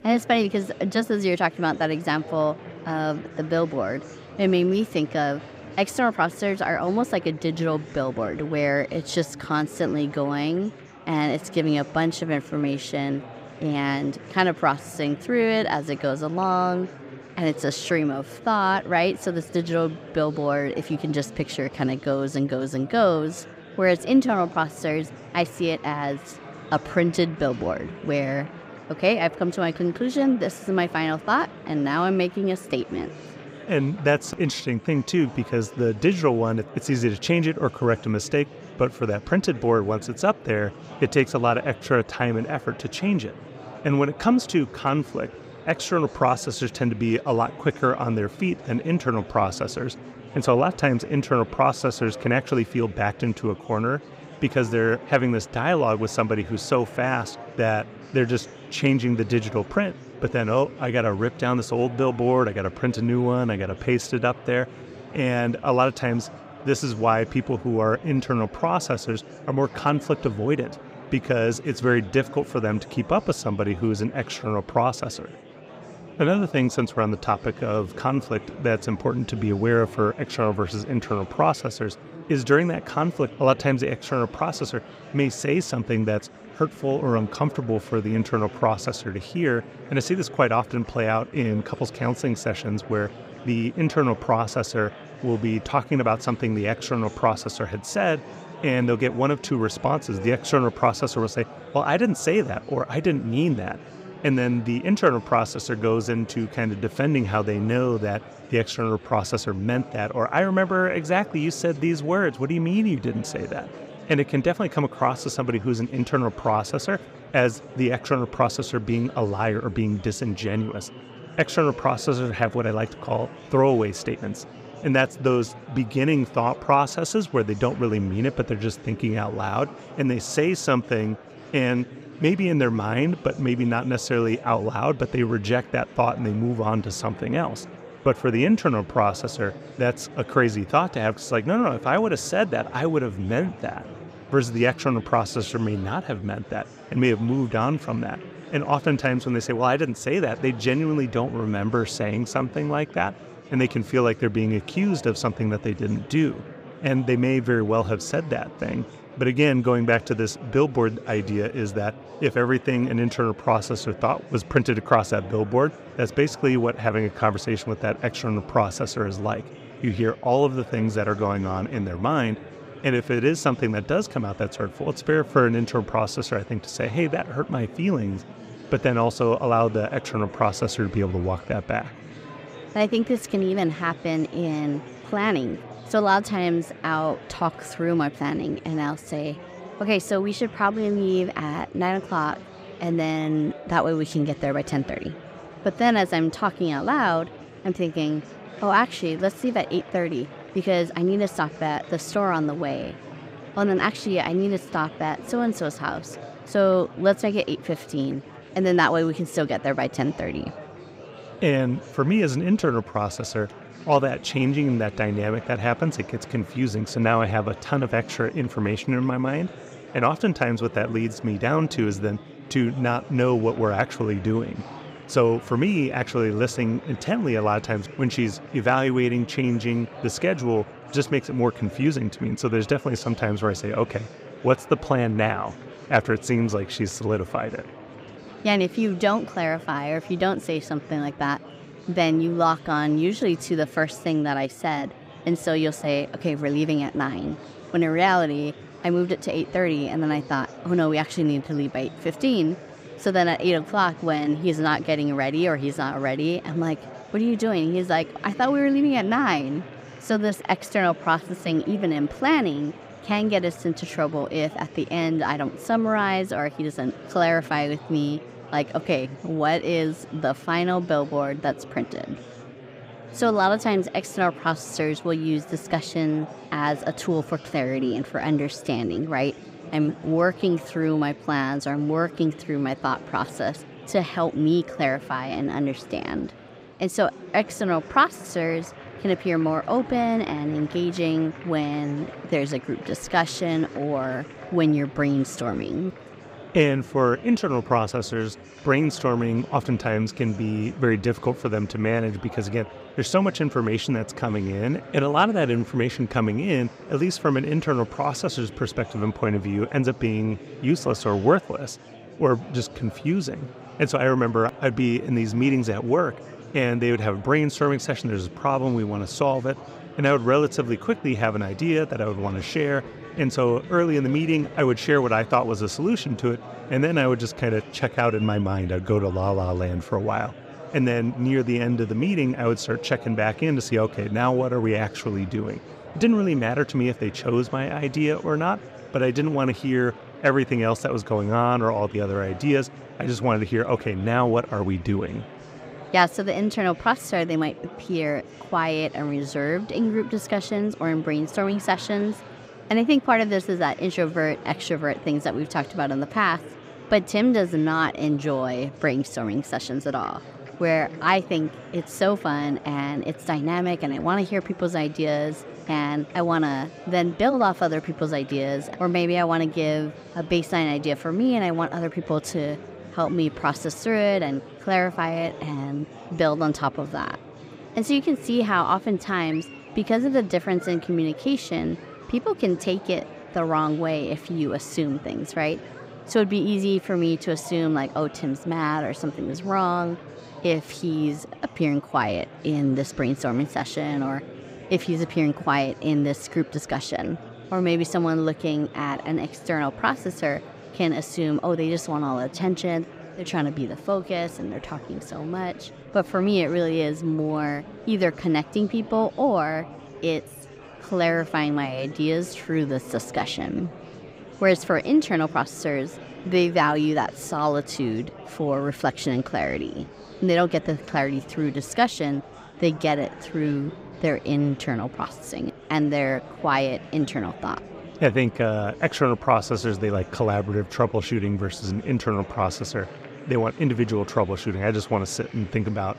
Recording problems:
murmuring crowd; noticeable; throughout; 15 dB below the speech

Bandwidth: 15.5 kHz